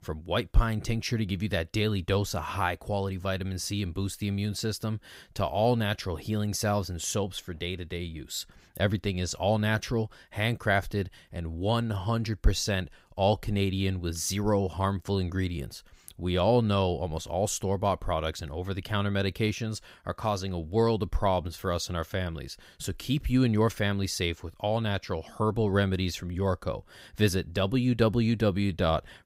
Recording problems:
none

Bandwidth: 15.5 kHz